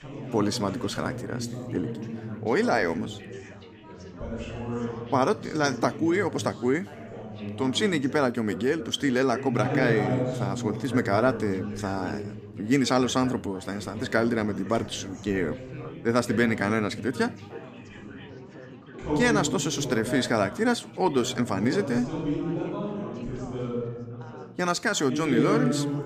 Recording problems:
chatter from many people; loud; throughout; 7 dB below the speech

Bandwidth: 14.5 kHz